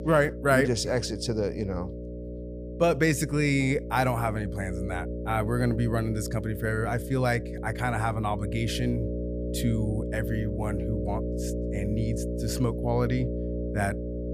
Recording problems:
electrical hum; loud; throughout; 60 Hz, 9 dB below the speech

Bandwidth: 15 kHz